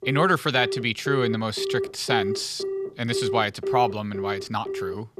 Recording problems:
alarms or sirens; loud; throughout; 5 dB below the speech

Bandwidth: 14.5 kHz